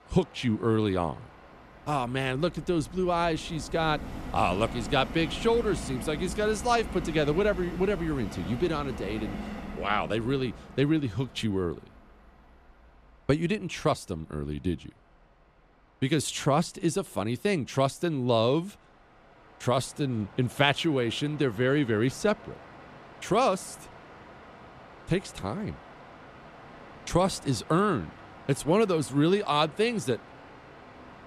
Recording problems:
train or aircraft noise; noticeable; throughout; 15 dB below the speech

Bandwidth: 14 kHz